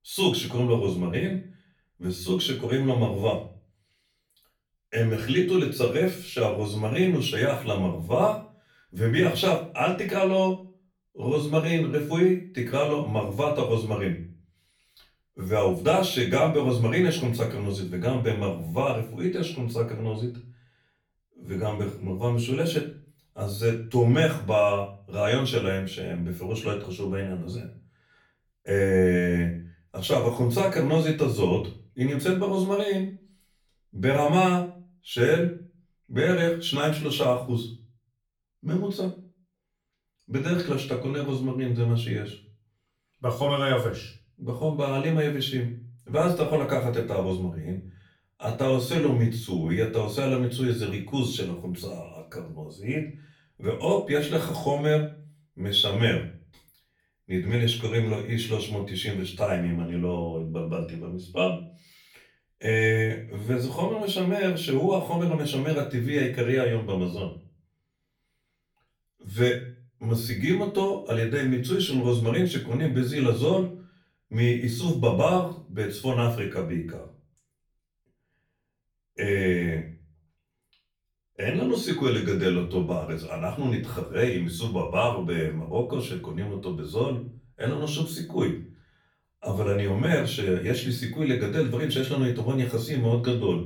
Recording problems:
off-mic speech; far
room echo; slight; dies away in 0.4 s

